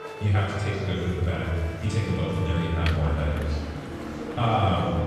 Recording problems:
off-mic speech; far
room echo; noticeable; dies away in 2 s
background music; noticeable; throughout; 15 dB below the speech
train or aircraft noise; noticeable; from 2.5 s on; 10 dB below the speech
chatter from many people; noticeable; throughout; 15 dB below the speech
electrical hum; faint; throughout; 60 Hz, 25 dB below the speech

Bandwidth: 14 kHz